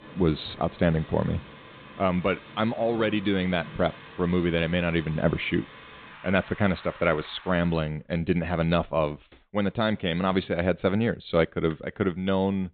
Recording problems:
high frequencies cut off; severe; nothing above 4 kHz
rain or running water; noticeable; until 7.5 s; 20 dB below the speech

